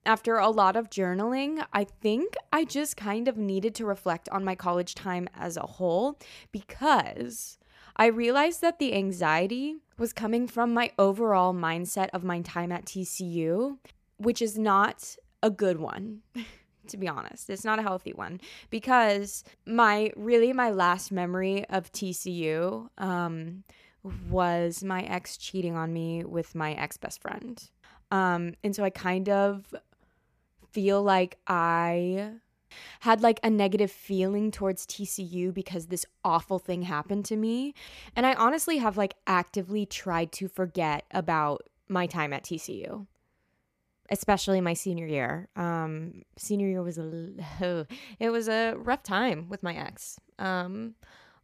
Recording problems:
none

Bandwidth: 14.5 kHz